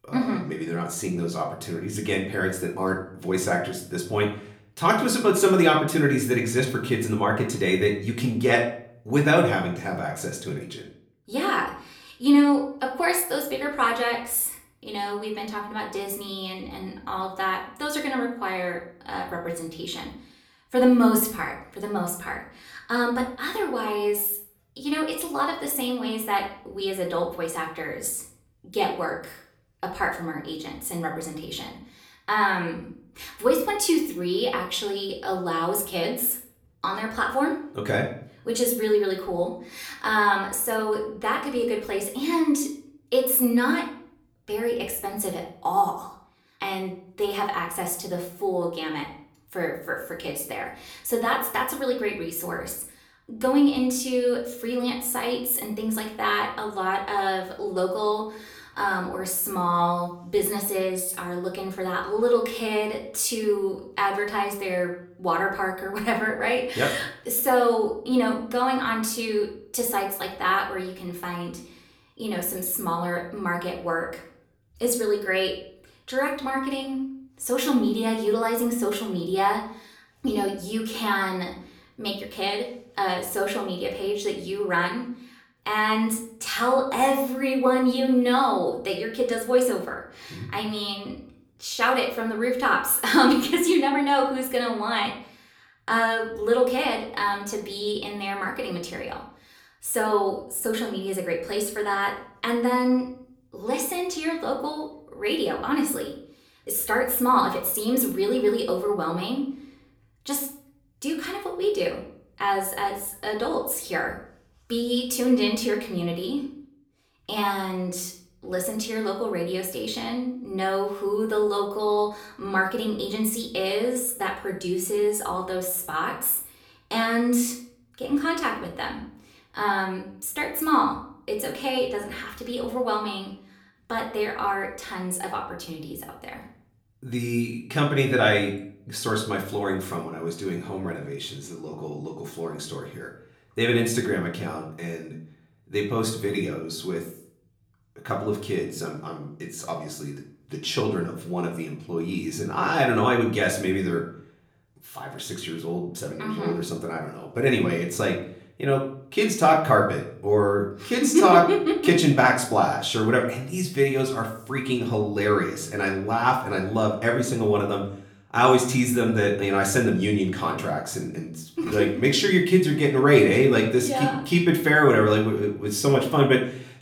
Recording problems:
off-mic speech; far
room echo; slight; dies away in 0.5 s

